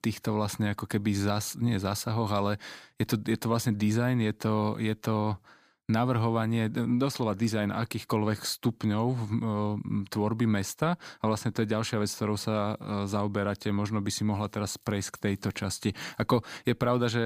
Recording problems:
abrupt cut into speech; at the end

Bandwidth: 15 kHz